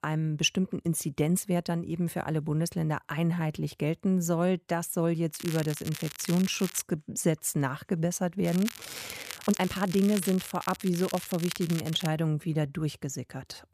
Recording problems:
crackling; noticeable; from 5.5 to 7 s and from 8.5 to 12 s; 10 dB below the speech
uneven, jittery; strongly; from 1.5 to 13 s

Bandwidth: 14.5 kHz